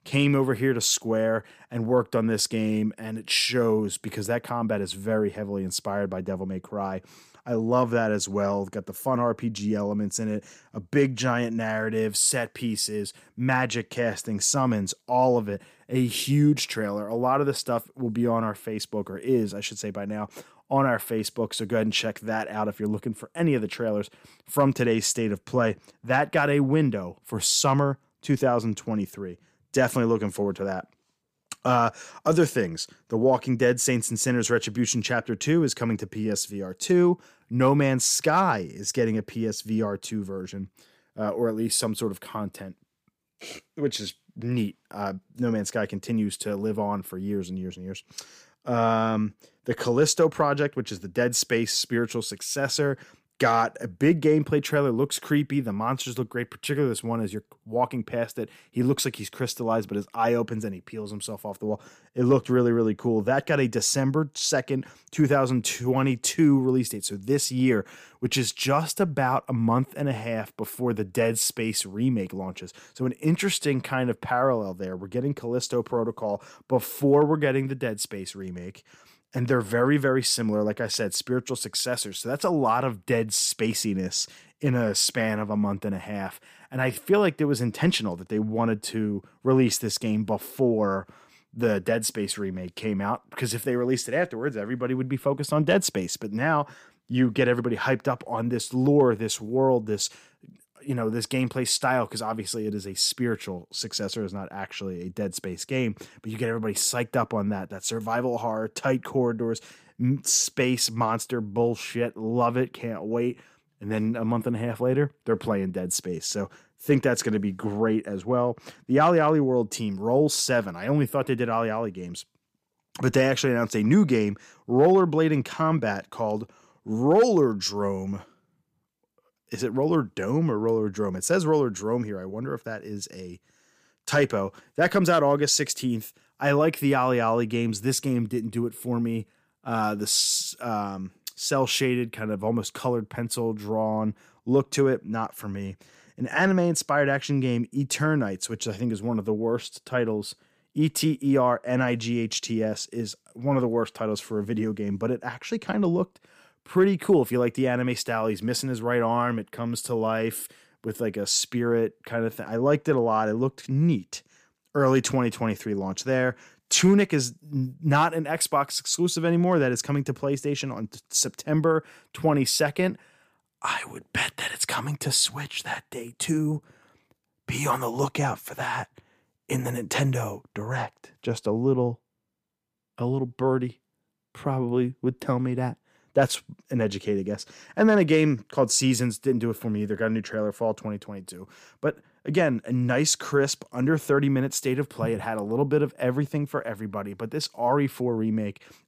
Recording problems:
none

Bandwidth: 15 kHz